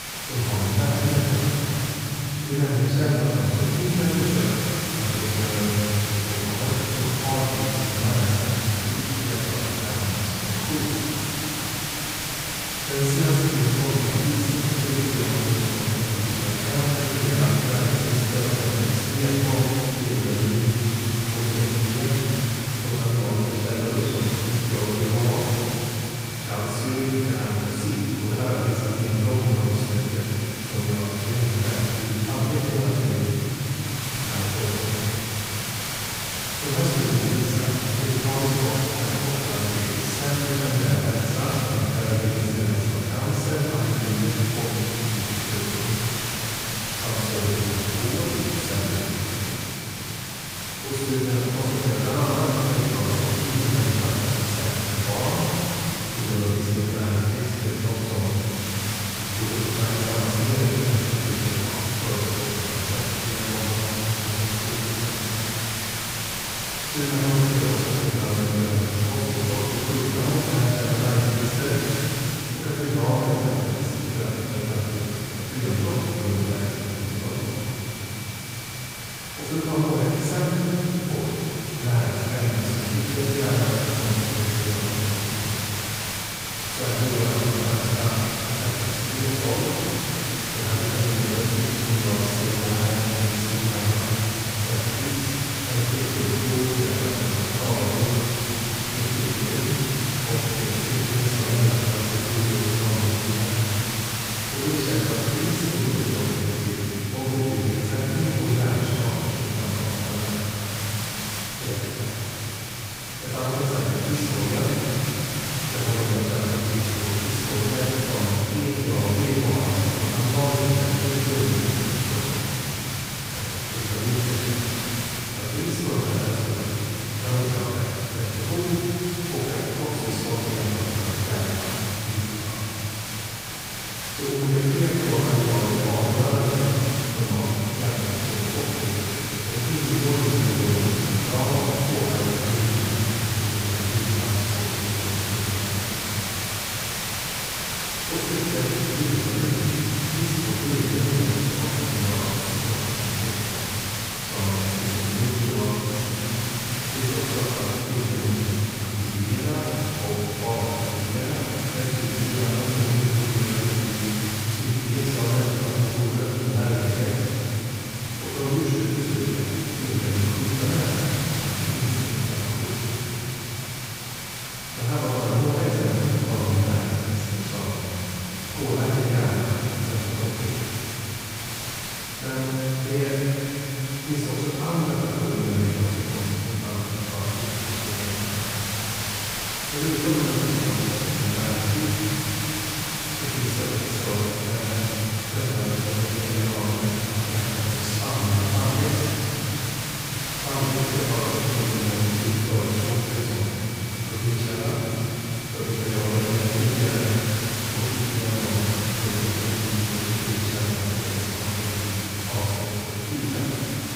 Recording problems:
room echo; strong; dies away in 3 s
off-mic speech; far
hiss; loud; throughout; 3 dB below the speech
high-pitched whine; faint; throughout; 2.5 kHz, 20 dB below the speech

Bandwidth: 15.5 kHz